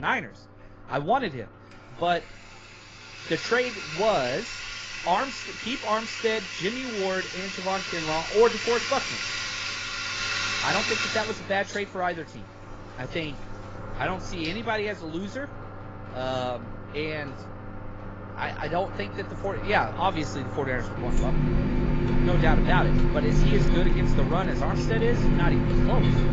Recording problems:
garbled, watery; badly; nothing above 7.5 kHz
household noises; very loud; throughout; as loud as the speech
abrupt cut into speech; at the start

